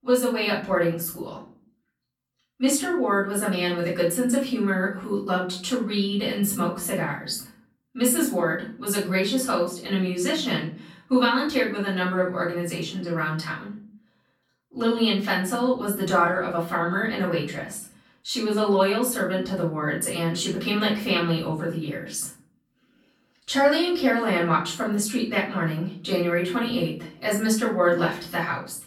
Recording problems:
off-mic speech; far
room echo; slight; dies away in 0.5 s

